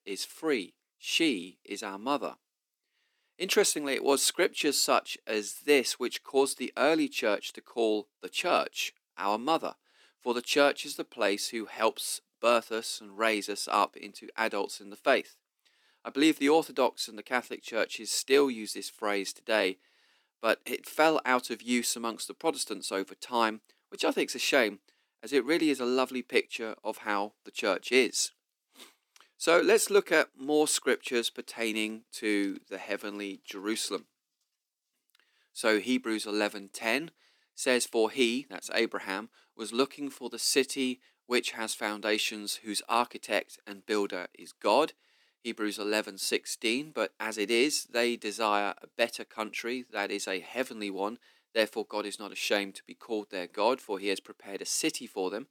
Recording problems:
thin; very slightly; fading below 250 Hz

